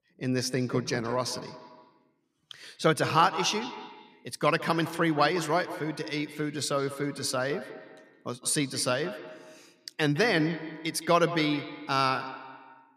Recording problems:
echo of what is said; noticeable; throughout; 160 ms later, 10 dB below the speech

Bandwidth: 14.5 kHz